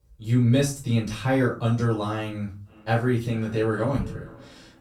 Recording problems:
off-mic speech; far
echo of what is said; faint; from 2.5 s on; 440 ms later, 25 dB below the speech
room echo; slight; dies away in 0.3 s

